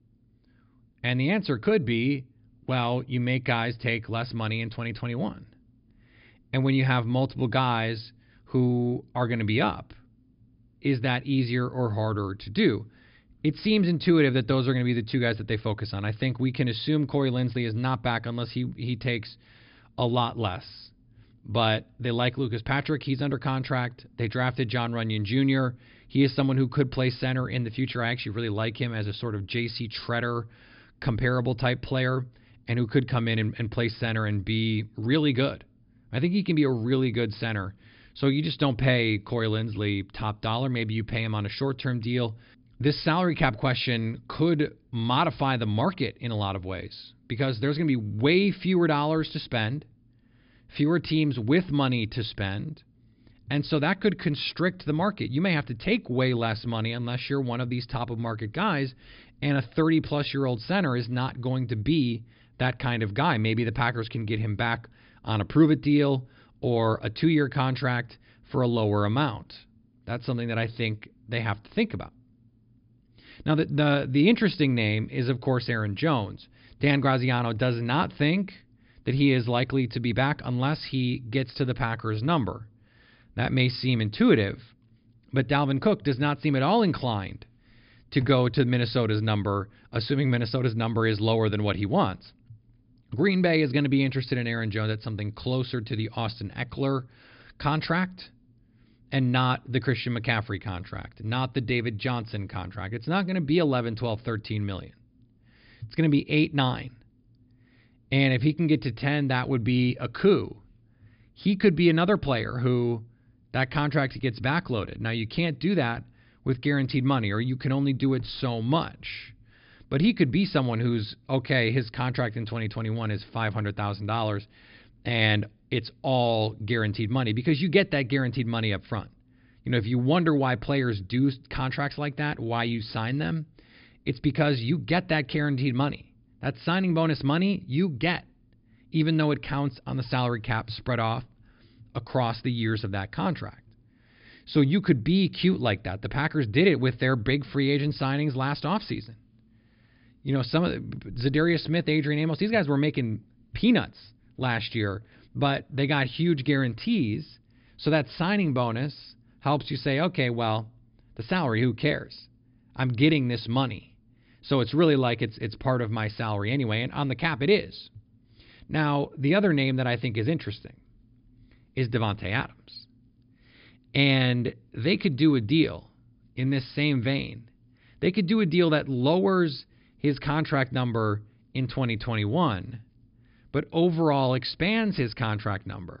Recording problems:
high frequencies cut off; noticeable; nothing above 5 kHz

